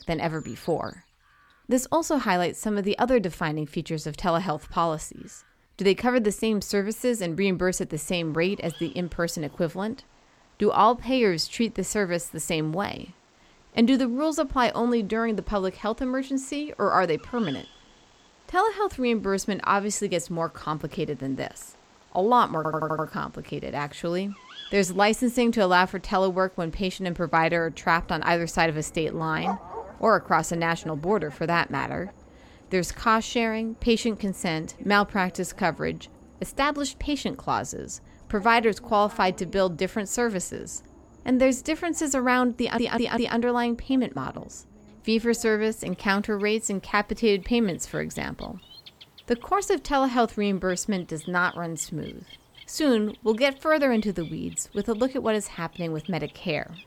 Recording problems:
animal sounds; faint; throughout; 25 dB below the speech
audio stuttering; at 23 s and at 43 s

